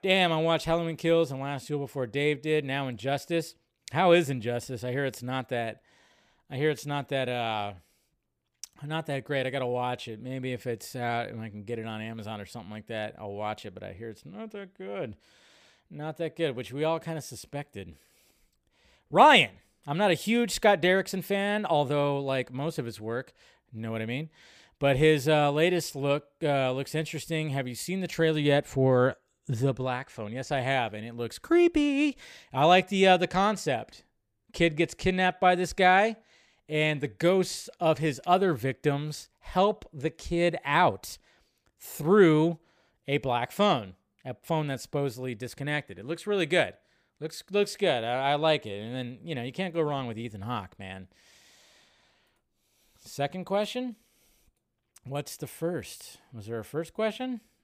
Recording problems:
none

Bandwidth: 15 kHz